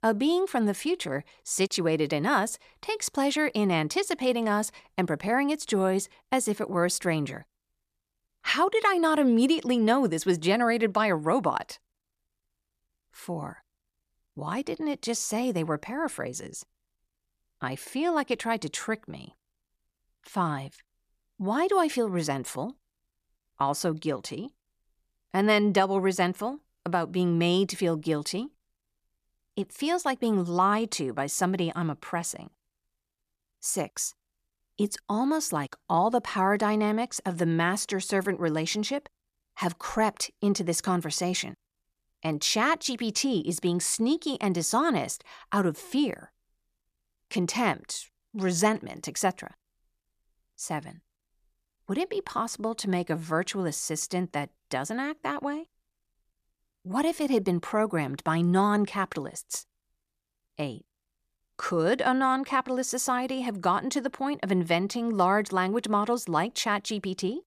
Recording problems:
none

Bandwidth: 14.5 kHz